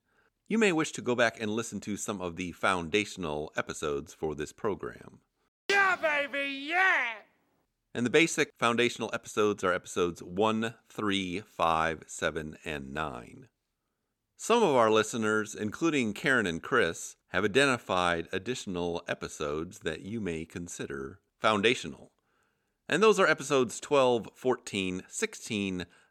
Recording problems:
none

